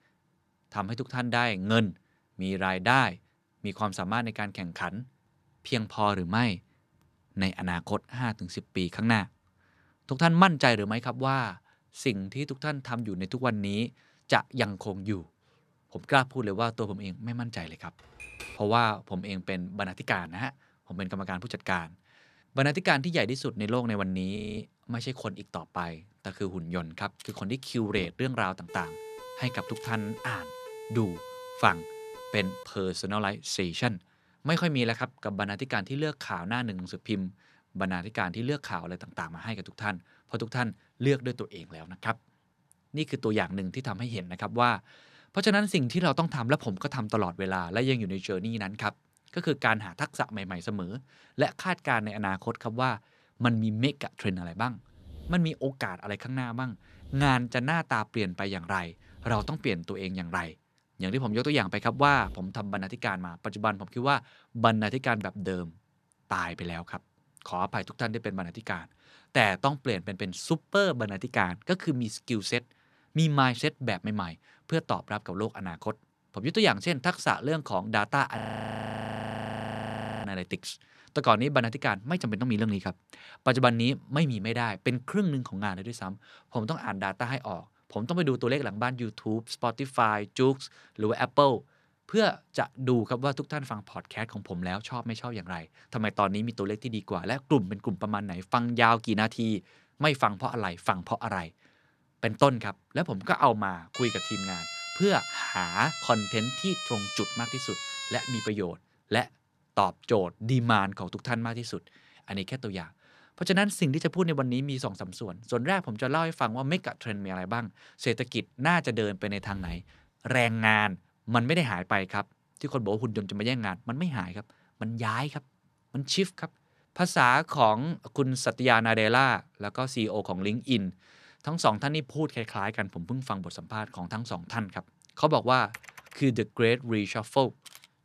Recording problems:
keyboard typing; faint; at 18 s; peak 10 dB below the speech
audio freezing; at 24 s and at 1:18 for 2 s
siren; faint; from 29 to 33 s; peak 15 dB below the speech
siren; noticeable; from 1:44 to 1:48; peak 4 dB below the speech

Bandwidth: 14 kHz